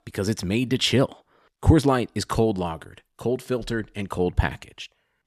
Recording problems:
none

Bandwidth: 13.5 kHz